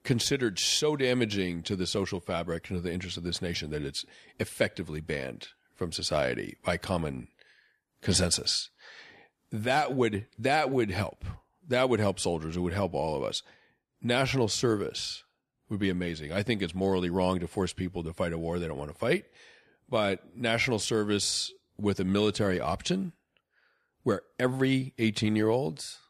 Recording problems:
none

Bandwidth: 14 kHz